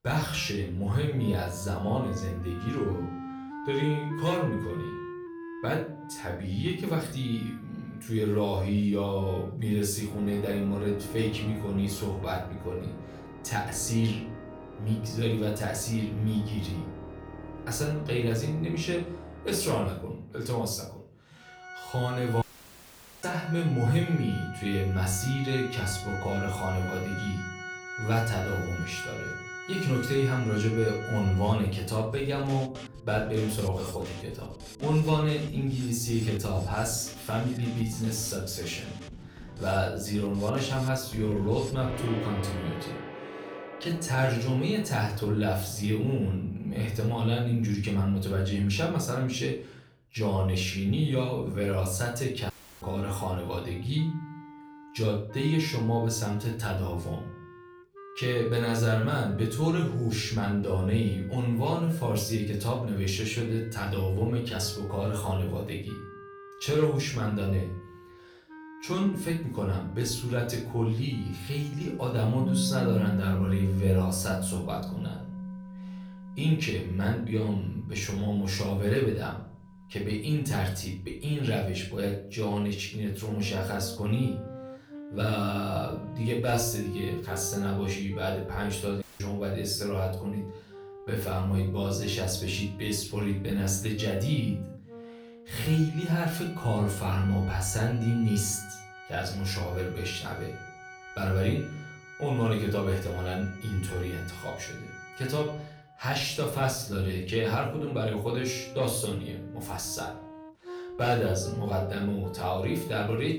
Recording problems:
off-mic speech; far
room echo; slight; dies away in 0.4 s
background music; noticeable; throughout; 10 dB below the speech
audio cutting out; at 22 s for 1 s, at 53 s and at 1:29

